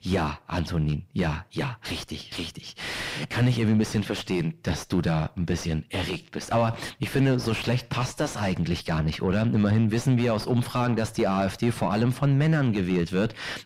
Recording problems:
distortion; heavy; 5 dB below the speech

